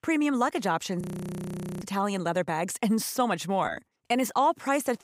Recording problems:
audio freezing; at 1 s for 1 s

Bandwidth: 15.5 kHz